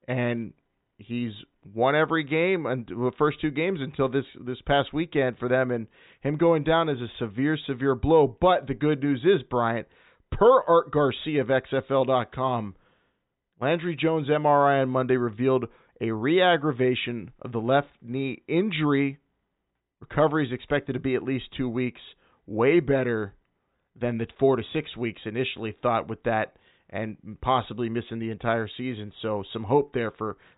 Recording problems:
high frequencies cut off; severe; nothing above 4 kHz

